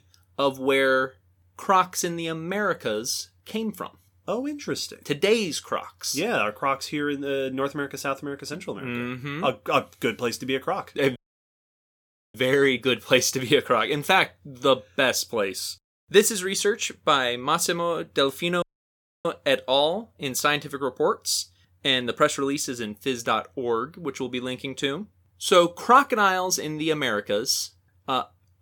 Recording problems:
audio cutting out; at 11 s for 1 s and at 19 s for 0.5 s

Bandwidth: 18 kHz